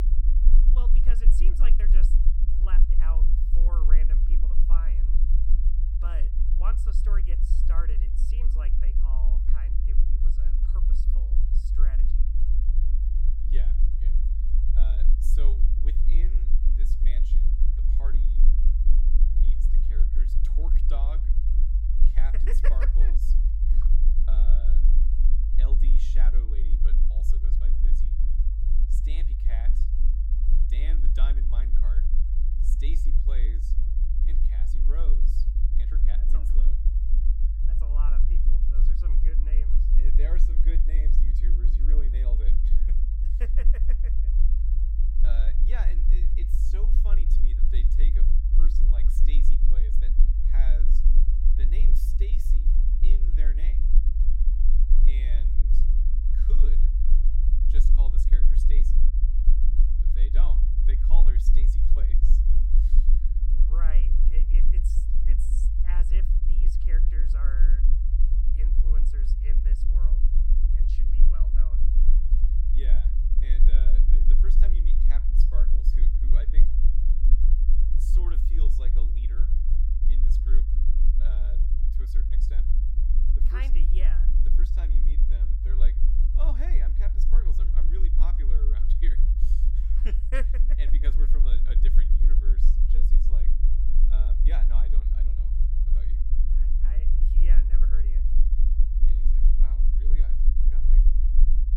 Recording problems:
low rumble; loud; throughout; 2 dB below the speech

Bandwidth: 17 kHz